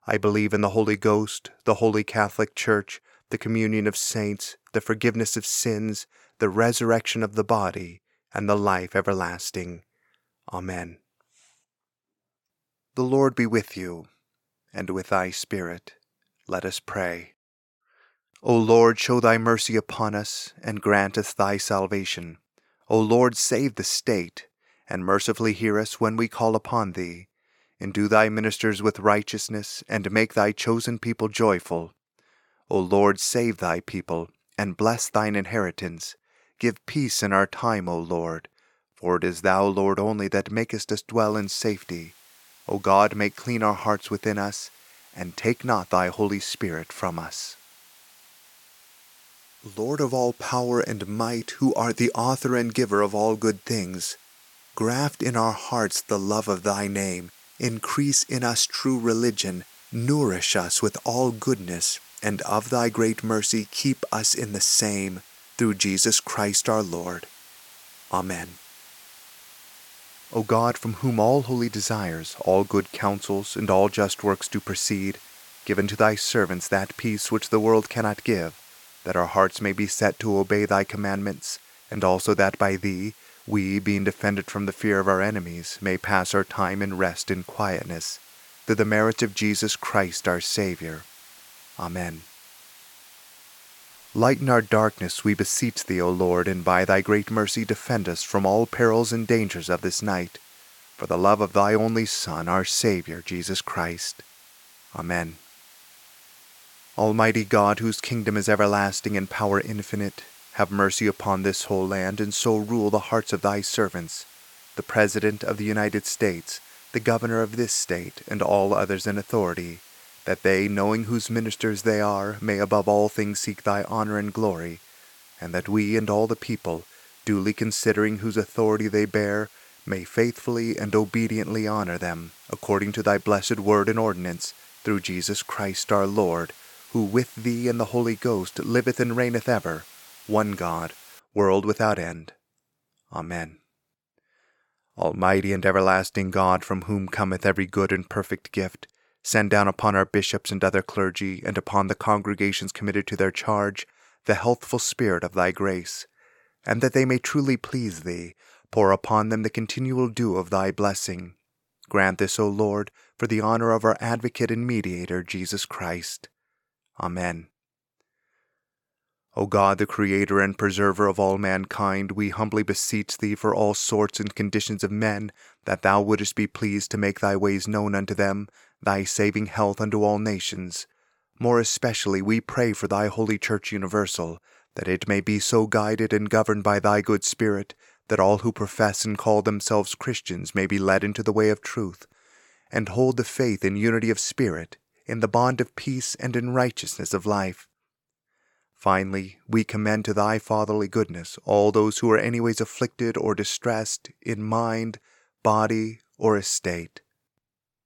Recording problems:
hiss; faint; from 41 s to 2:21; 25 dB below the speech

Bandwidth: 17 kHz